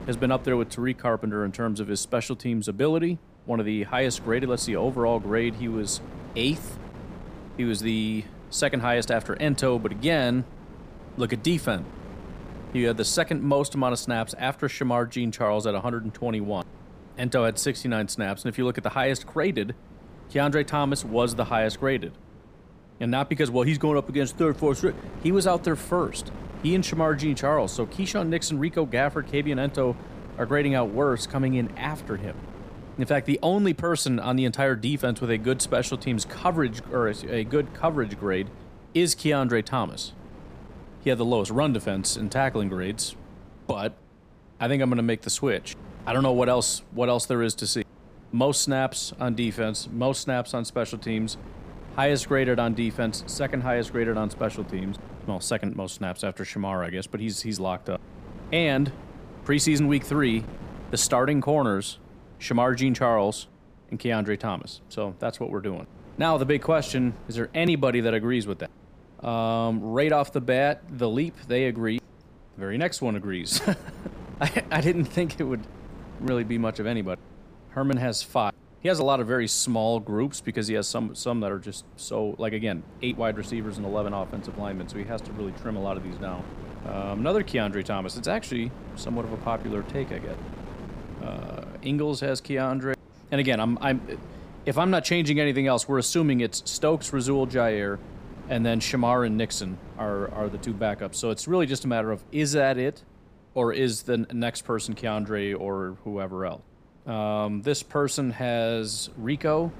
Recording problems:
wind noise on the microphone; occasional gusts; 20 dB below the speech

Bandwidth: 15 kHz